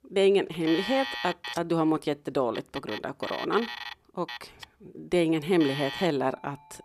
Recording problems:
alarms or sirens; loud; throughout; 9 dB below the speech

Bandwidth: 14.5 kHz